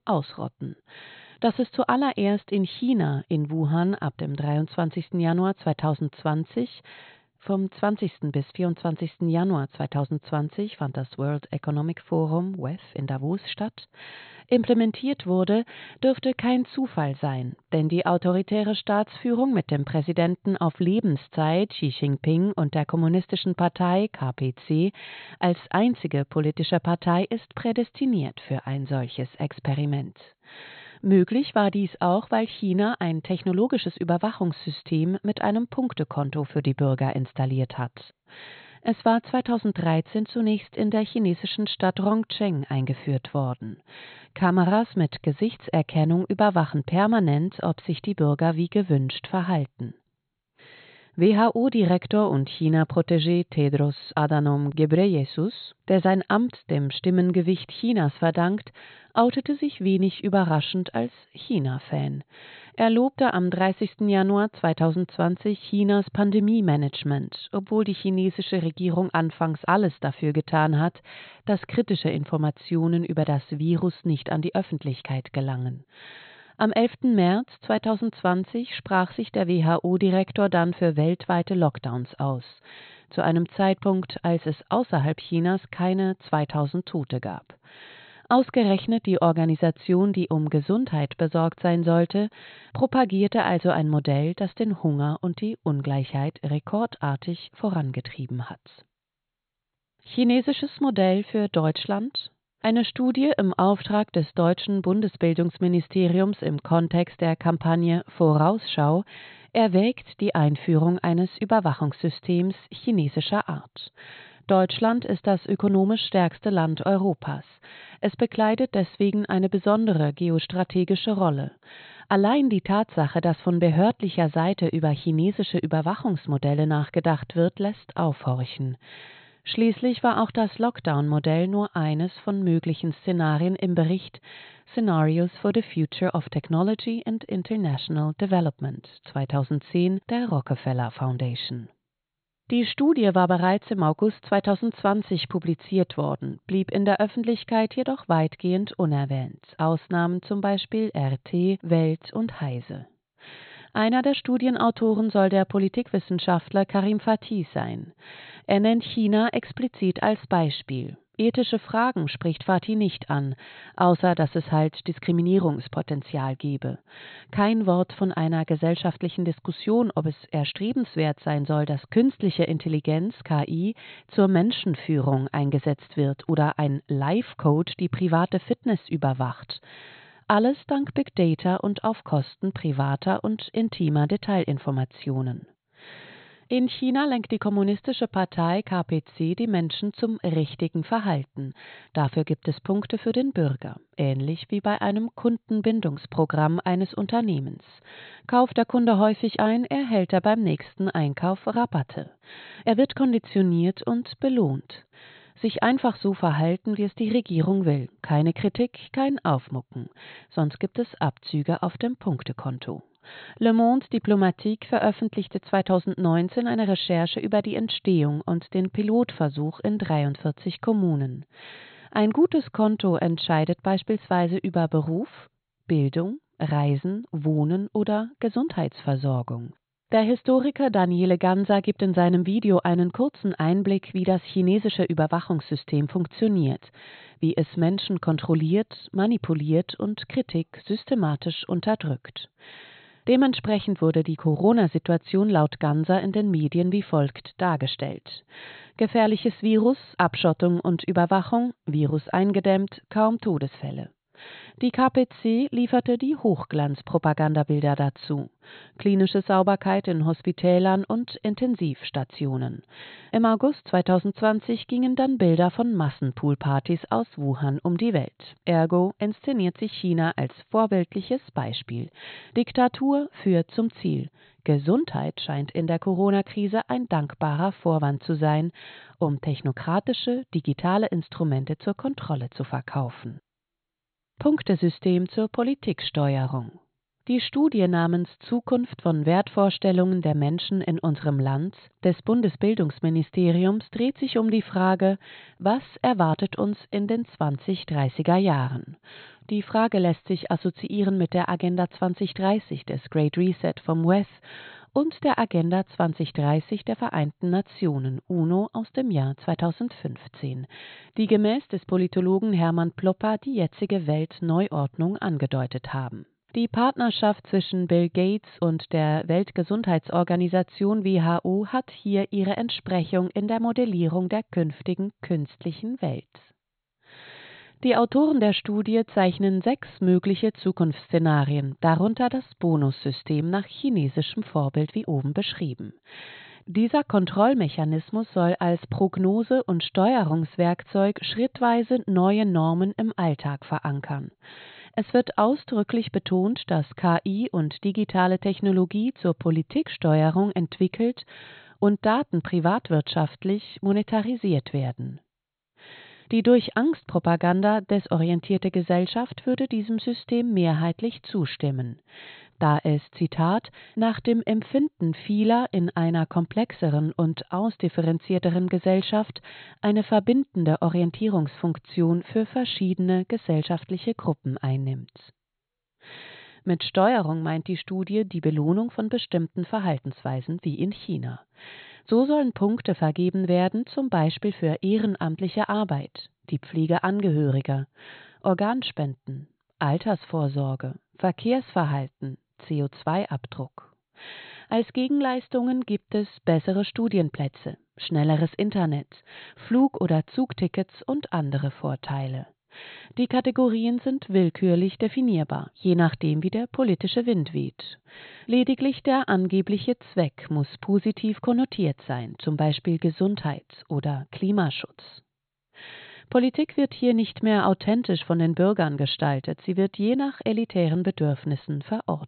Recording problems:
high frequencies cut off; severe; nothing above 4 kHz

